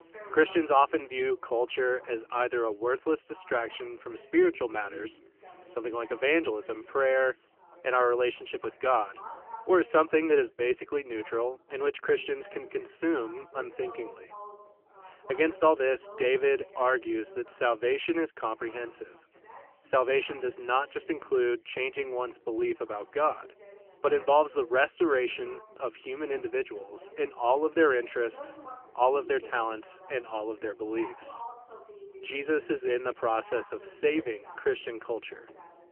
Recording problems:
phone-call audio; poor line; nothing above 3 kHz
background chatter; faint; throughout; 3 voices, 20 dB below the speech
household noises; very faint; throughout; 40 dB below the speech

